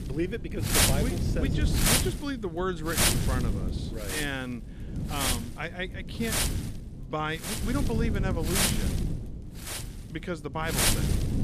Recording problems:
wind noise on the microphone; heavy; 5 dB above the speech

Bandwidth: 14.5 kHz